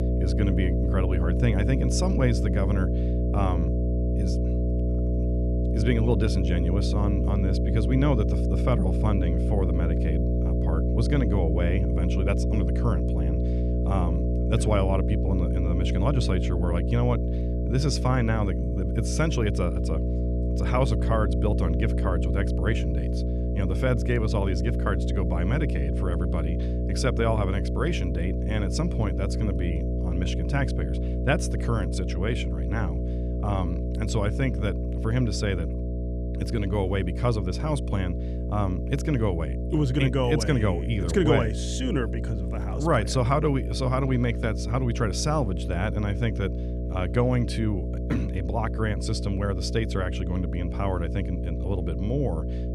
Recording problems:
electrical hum; loud; throughout; 60 Hz, 5 dB below the speech

